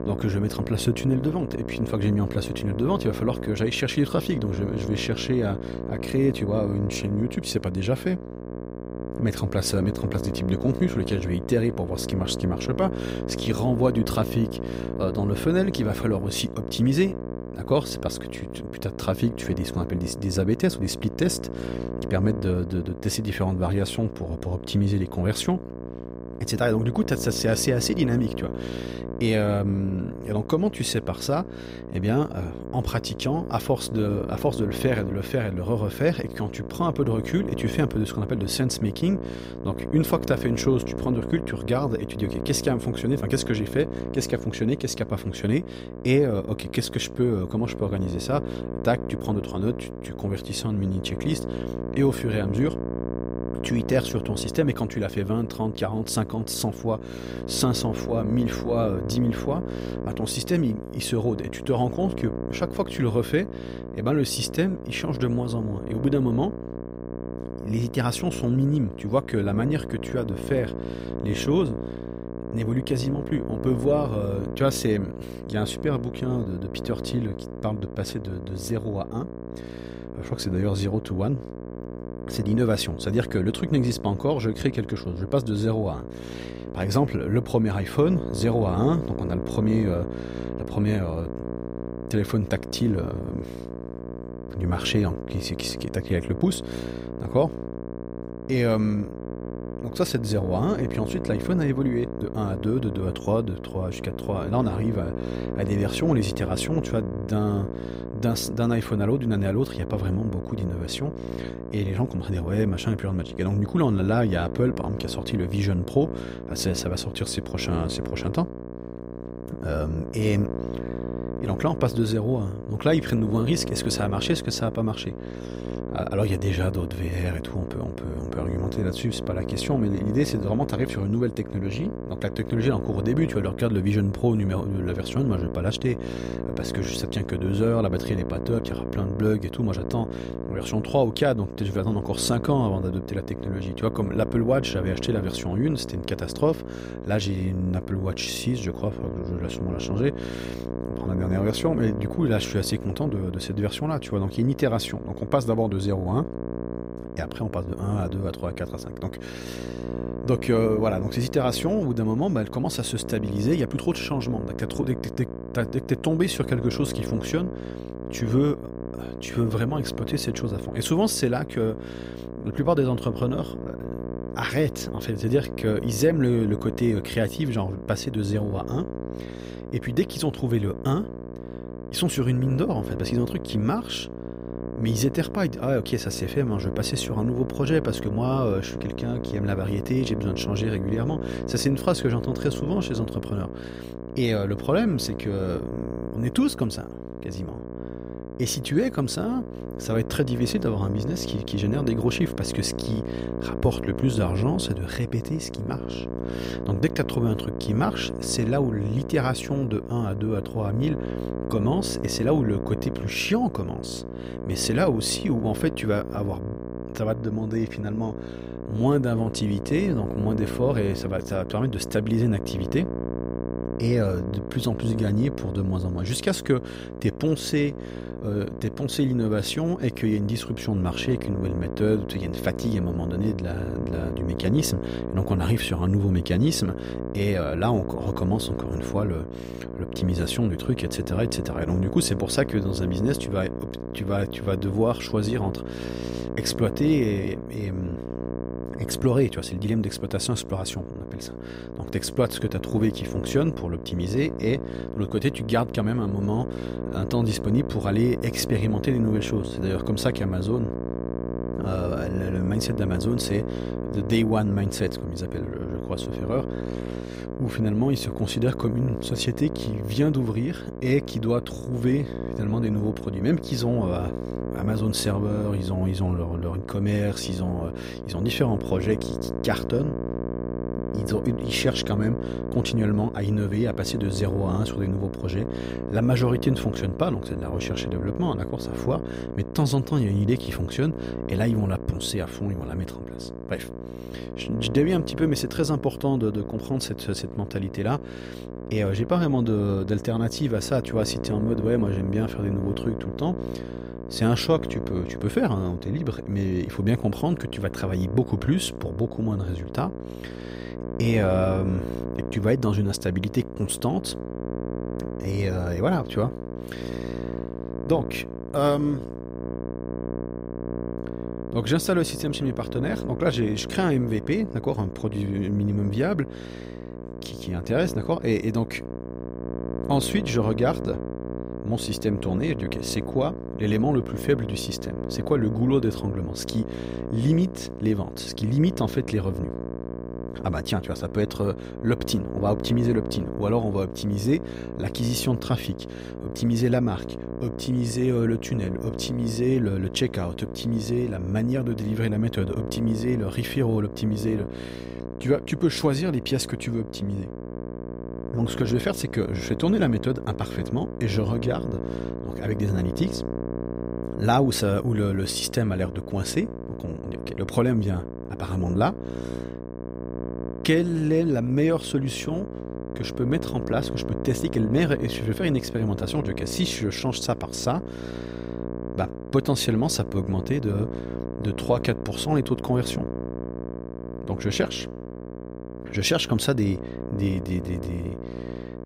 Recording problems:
electrical hum; loud; throughout; 60 Hz, 7 dB below the speech

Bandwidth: 15.5 kHz